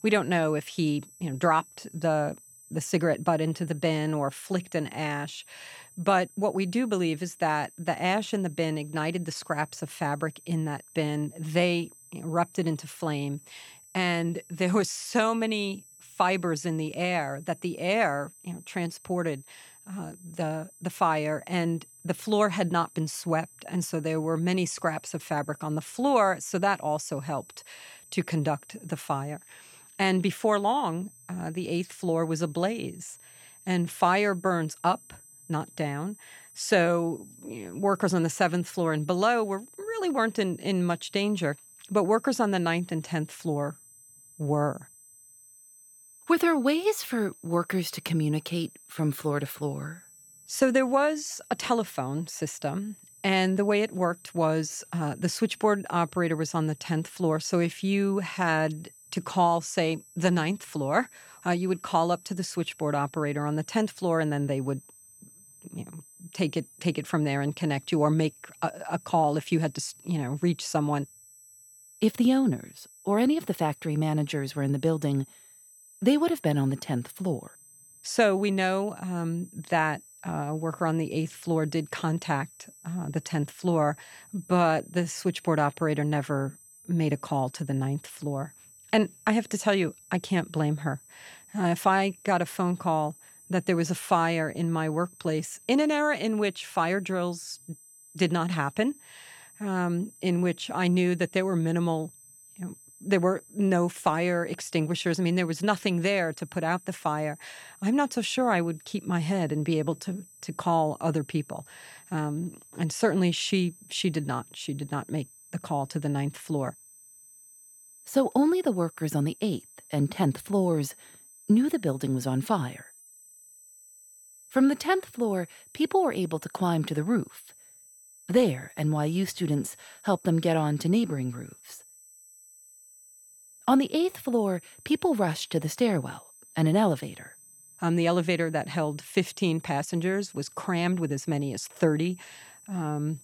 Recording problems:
high-pitched whine; faint; throughout; 8 kHz, 25 dB below the speech

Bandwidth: 18 kHz